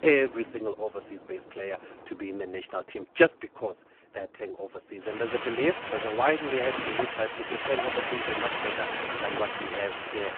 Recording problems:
phone-call audio; poor line
wind in the background; loud; throughout; 2 dB below the speech

